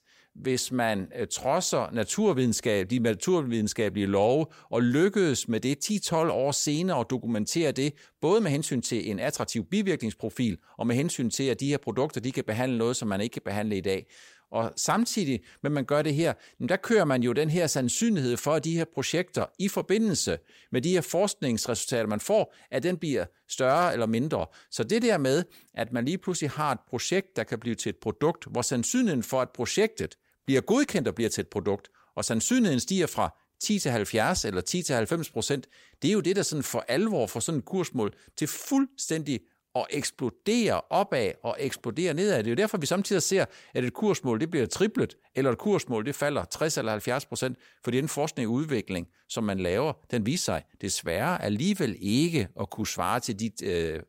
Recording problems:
none

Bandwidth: 16 kHz